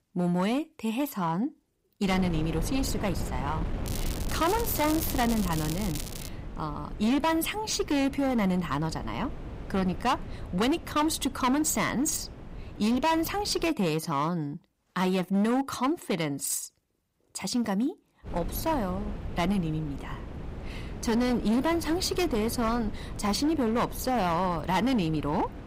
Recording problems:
distortion; slight; 10% of the sound clipped
wind noise on the microphone; occasional gusts; from 2 to 14 s and from 18 s on; 15 dB below the speech
crackling; noticeable; from 4 to 6.5 s; 10 dB below the speech

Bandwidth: 15.5 kHz